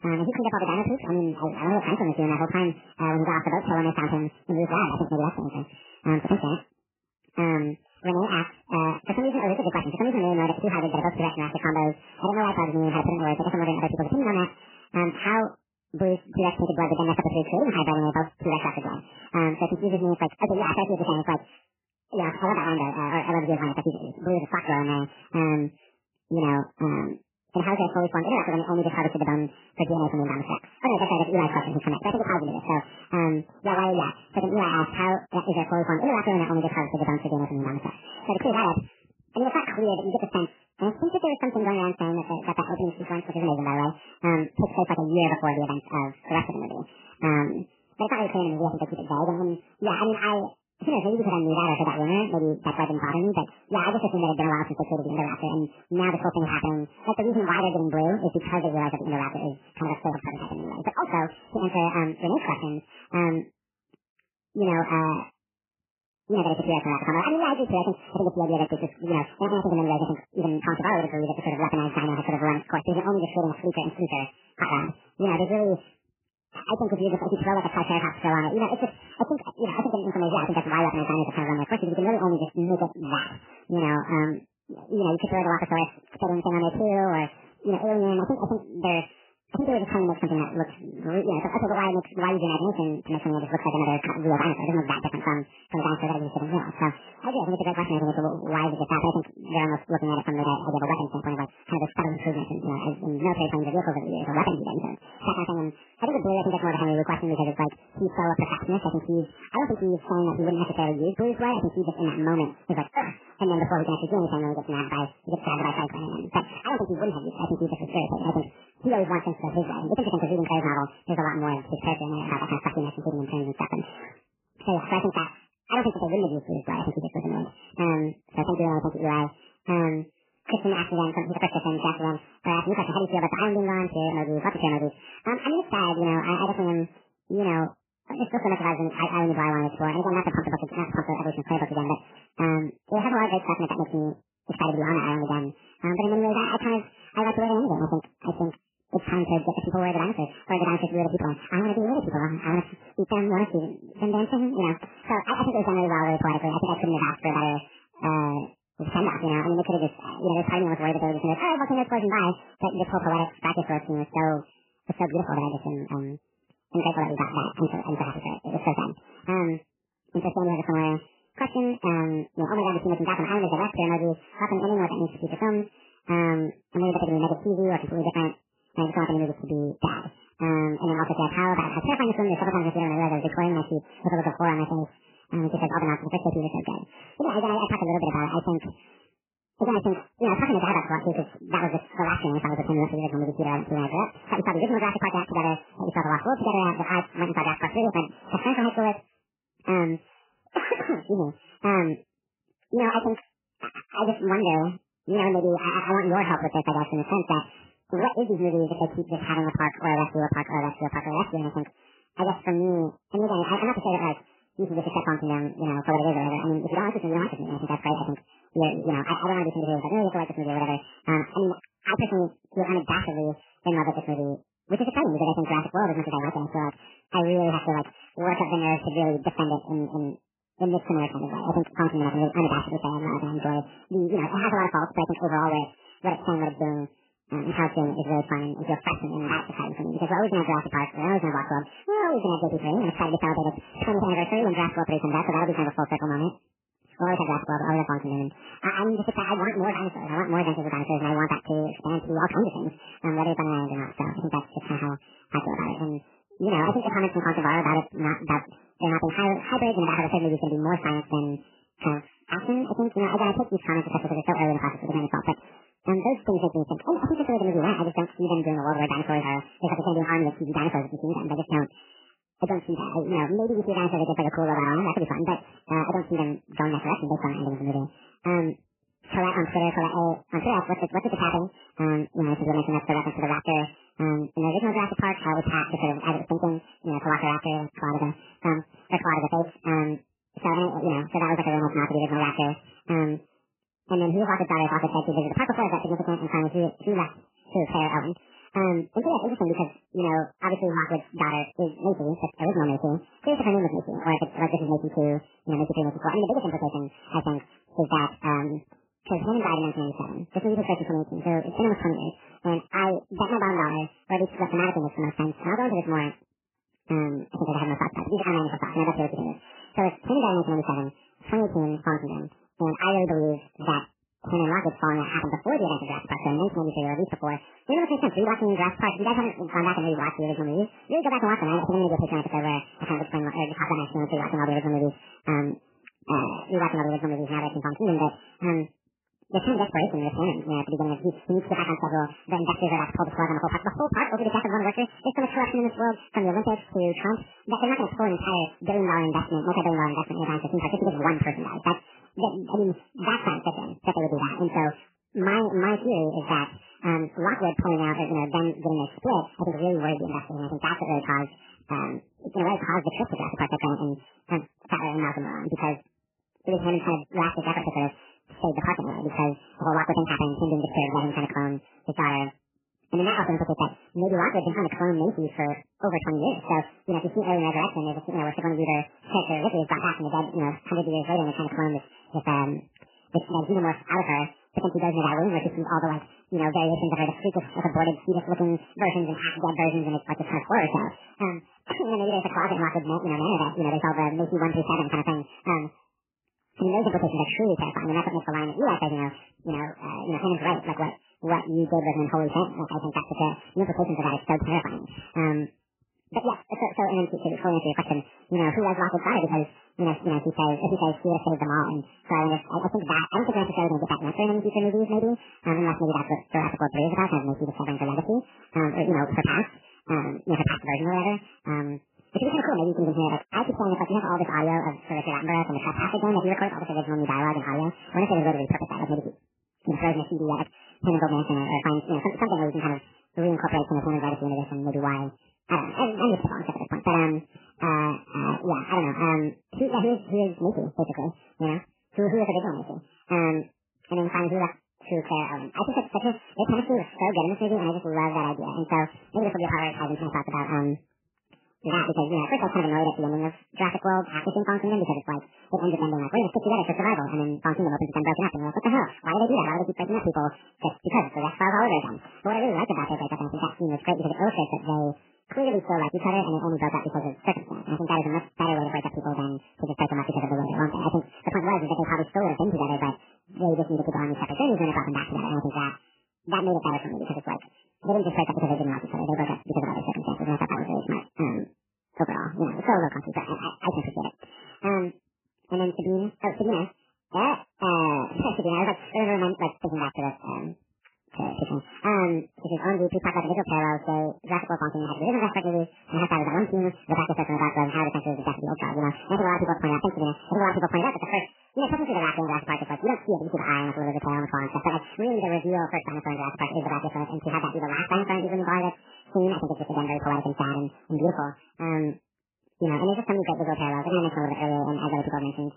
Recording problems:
garbled, watery; badly; nothing above 3 kHz
wrong speed and pitch; too fast and too high; 1.7 times normal speed

